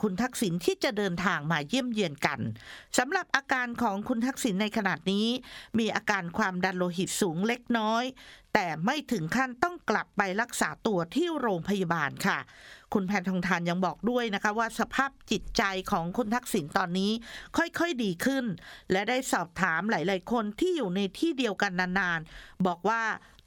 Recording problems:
squashed, flat; somewhat

